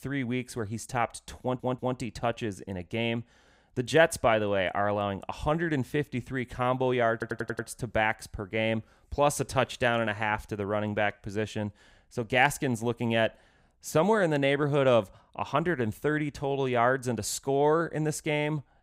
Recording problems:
audio stuttering; at 1.5 s and at 7 s

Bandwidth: 15.5 kHz